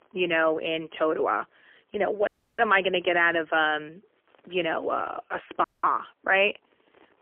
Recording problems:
phone-call audio; poor line; nothing above 3 kHz
audio cutting out; at 2.5 s and at 5.5 s

